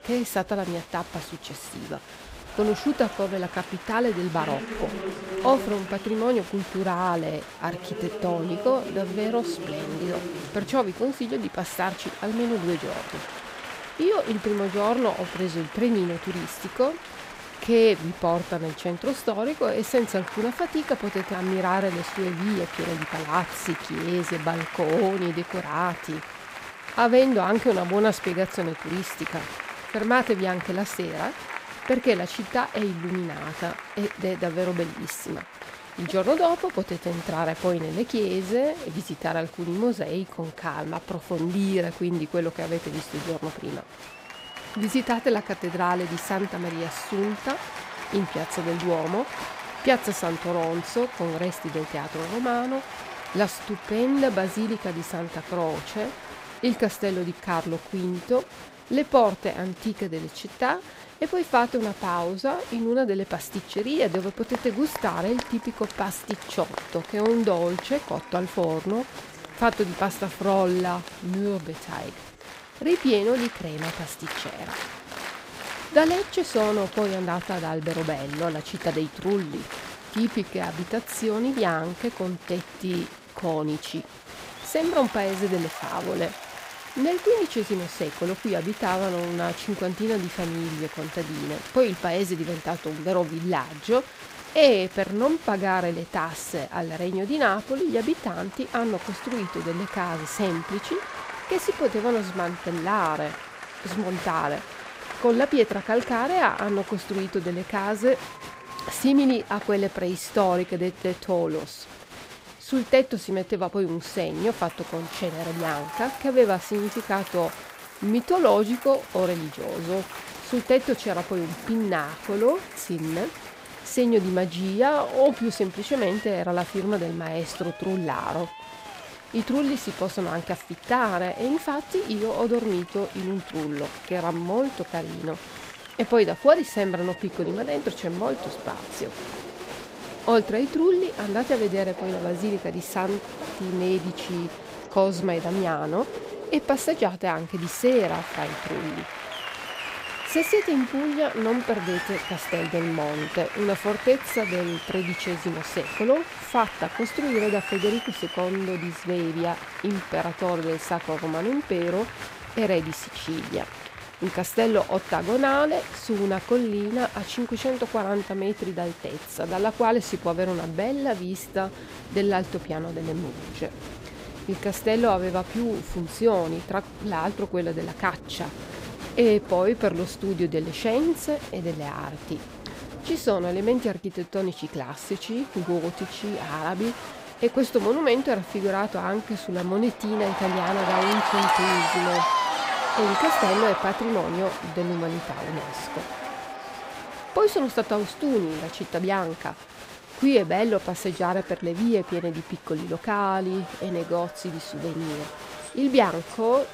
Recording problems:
crowd noise; loud; throughout; 10 dB below the speech

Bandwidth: 15.5 kHz